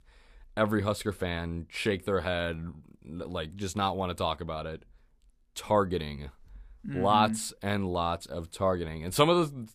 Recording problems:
none

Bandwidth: 14.5 kHz